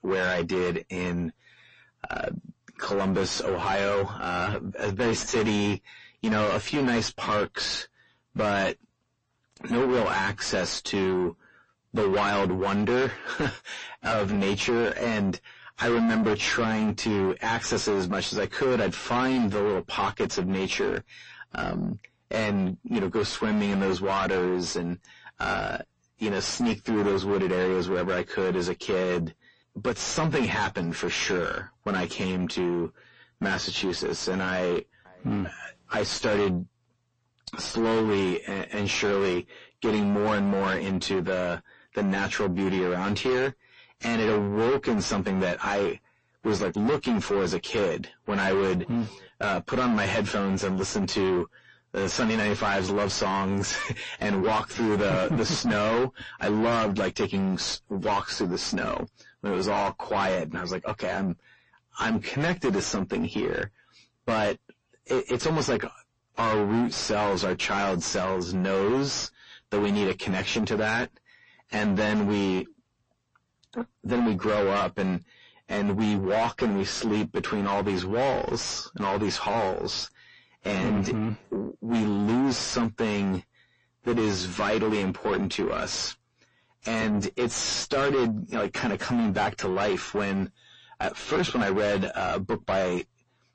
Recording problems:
distortion; heavy; 5 dB below the speech
garbled, watery; slightly; nothing above 7.5 kHz

